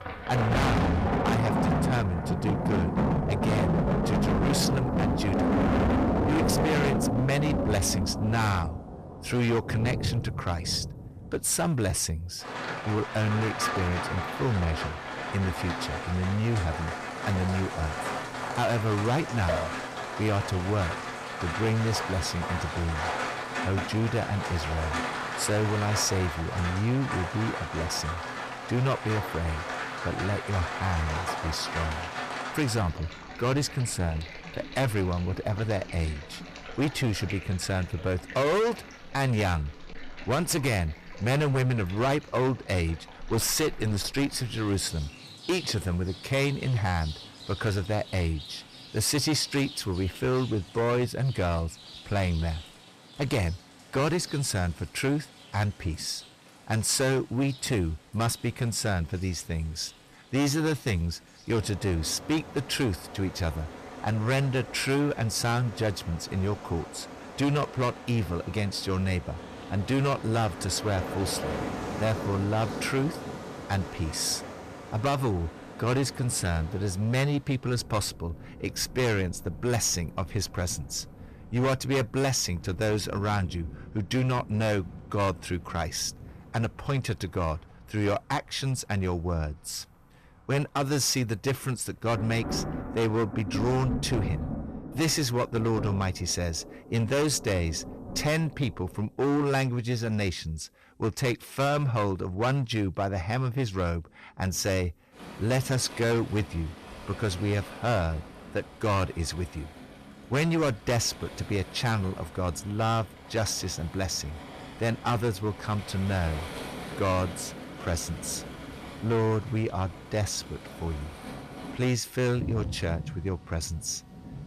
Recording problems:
distortion; heavy; 12% of the sound clipped
rain or running water; loud; throughout; 5 dB below the speech

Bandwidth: 14.5 kHz